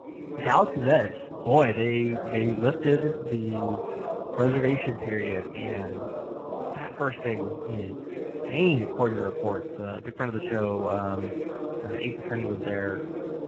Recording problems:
garbled, watery; badly
voice in the background; loud; throughout; 7 dB below the speech

